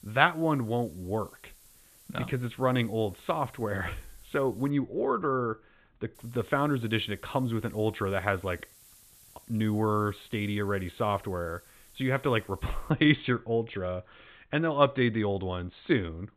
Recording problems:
high frequencies cut off; severe; nothing above 4 kHz
hiss; faint; until 4.5 s and from 6 to 13 s; 25 dB below the speech

